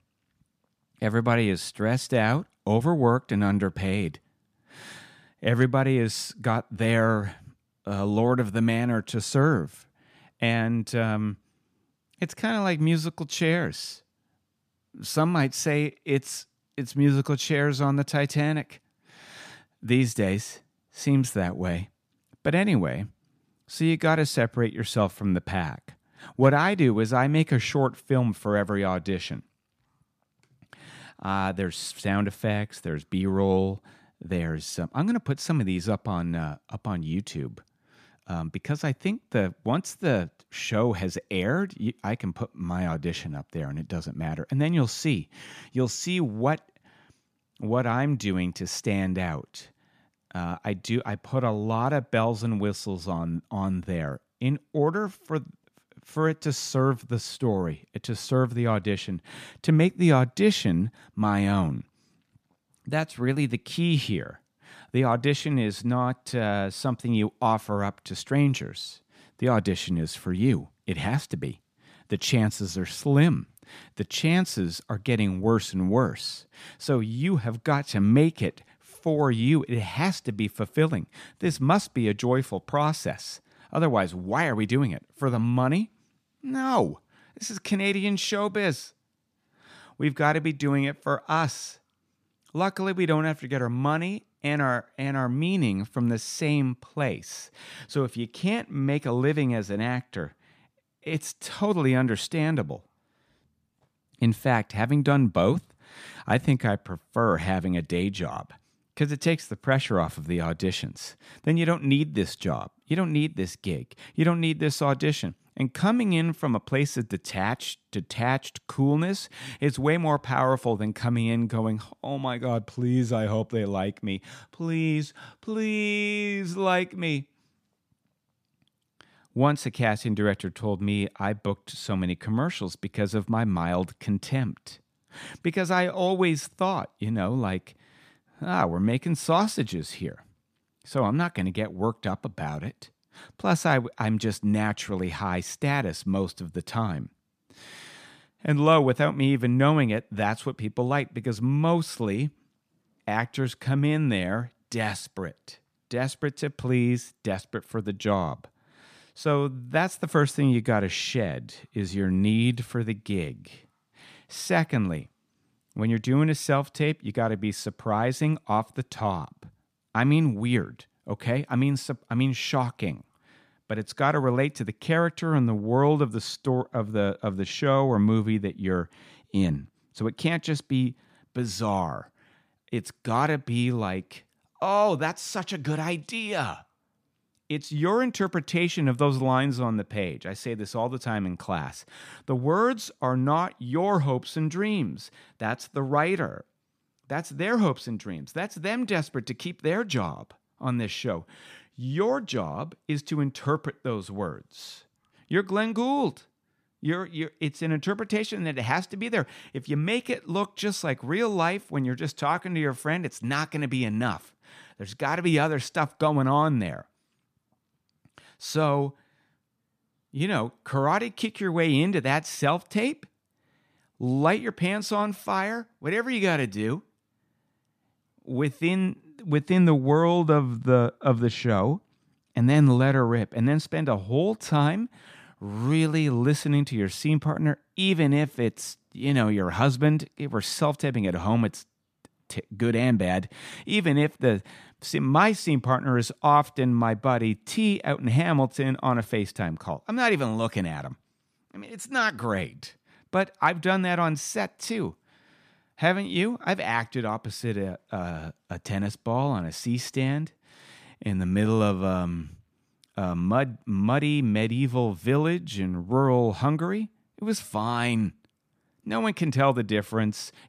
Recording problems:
none

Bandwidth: 14.5 kHz